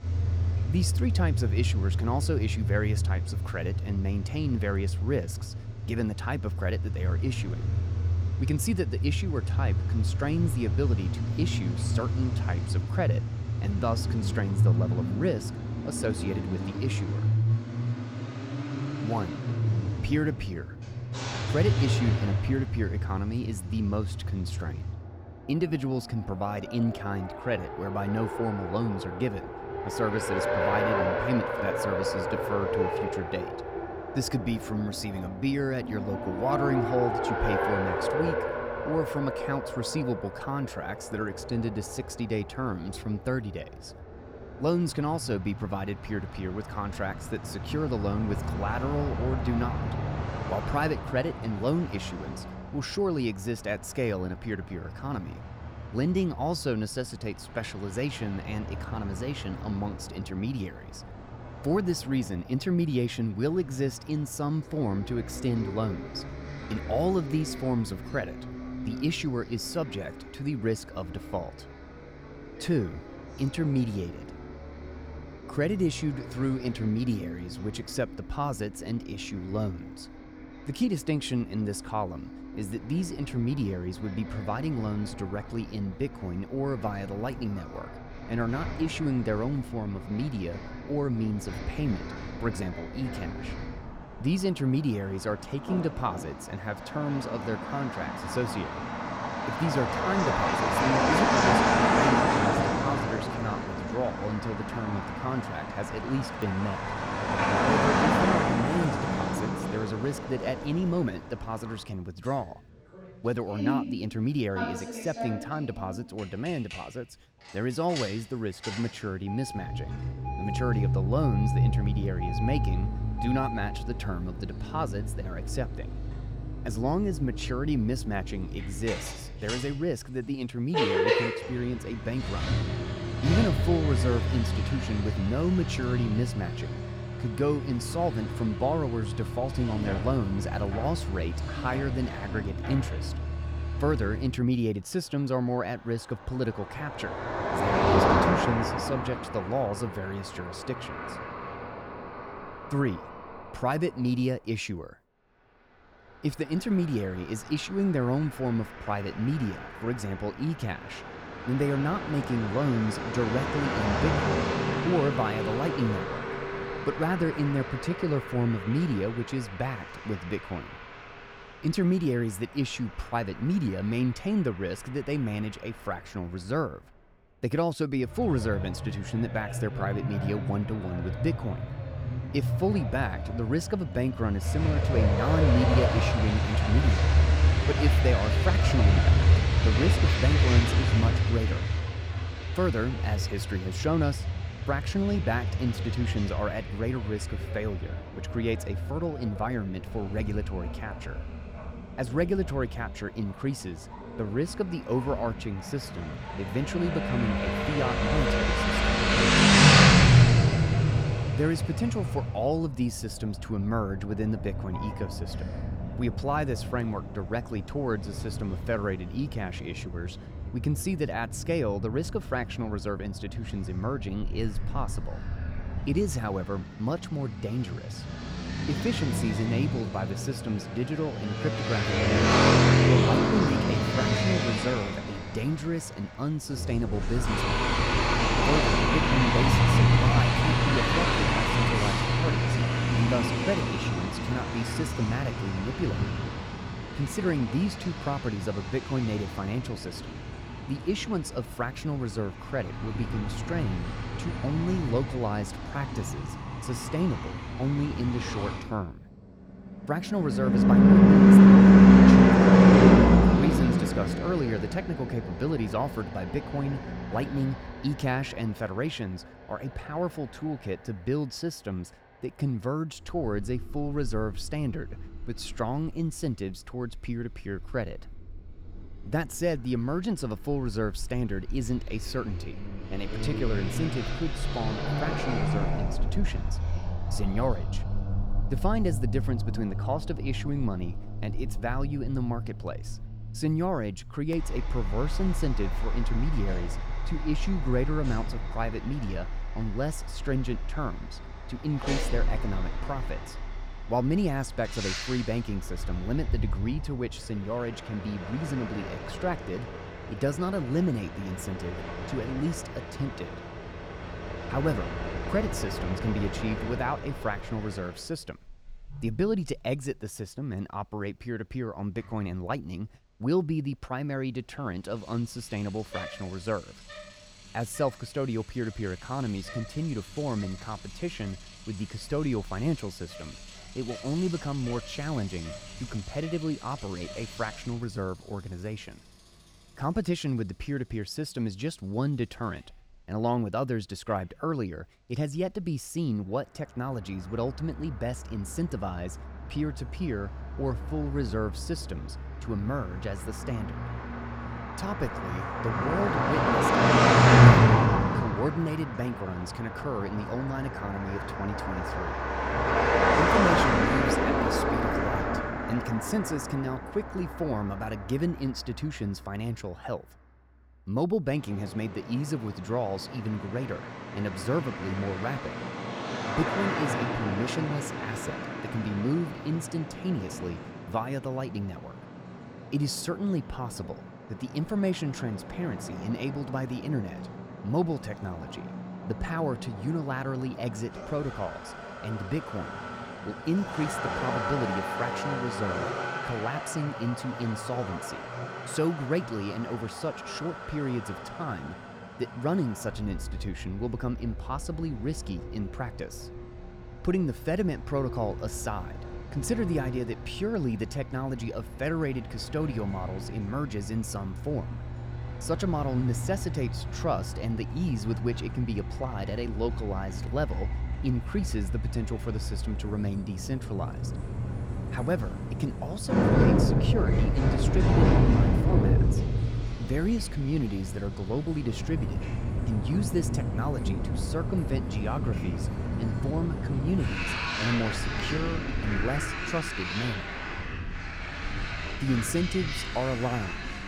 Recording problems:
traffic noise; very loud; throughout; 4 dB above the speech

